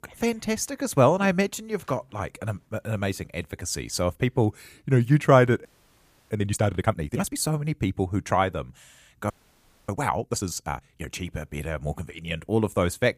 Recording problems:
audio freezing; at 5.5 s for 0.5 s and at 9.5 s for 0.5 s

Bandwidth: 15 kHz